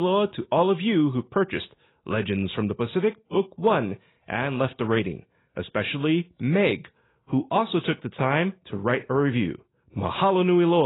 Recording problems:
garbled, watery; badly; nothing above 4 kHz
abrupt cut into speech; at the start and the end

